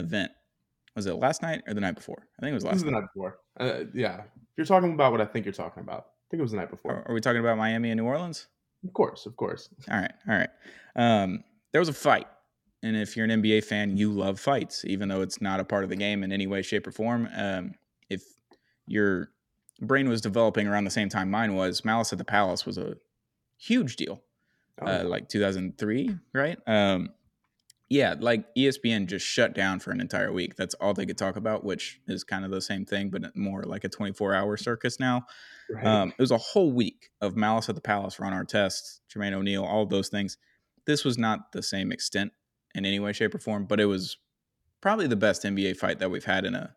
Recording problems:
abrupt cut into speech; at the start

